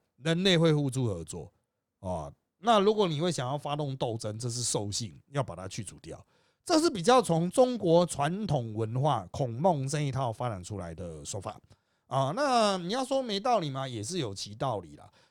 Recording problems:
none

